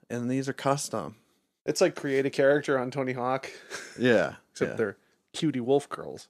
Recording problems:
none

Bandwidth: 14 kHz